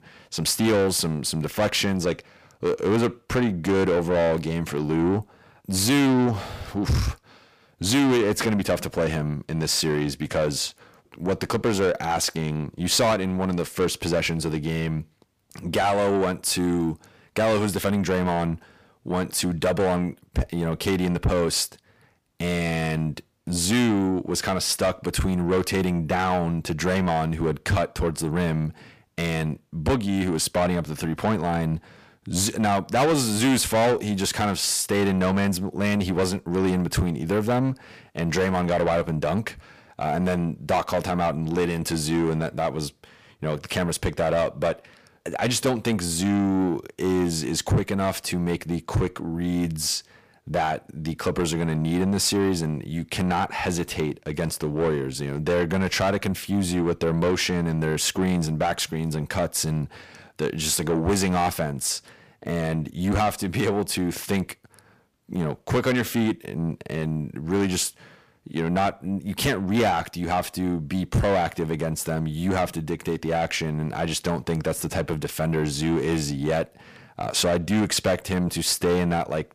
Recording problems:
distortion; heavy; 8 dB below the speech

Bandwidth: 15 kHz